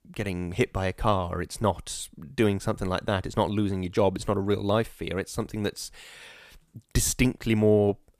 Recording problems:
none

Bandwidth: 14.5 kHz